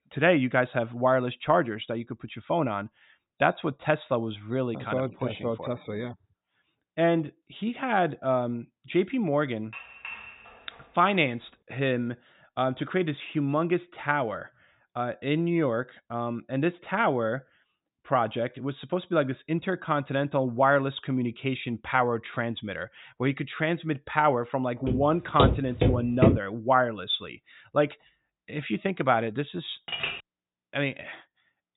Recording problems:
high frequencies cut off; severe; nothing above 4 kHz
clattering dishes; faint; from 9.5 to 11 s; peak 10 dB below the speech
footsteps; loud; from 25 to 26 s; peak 5 dB above the speech
clattering dishes; noticeable; at 30 s; peak 3 dB below the speech

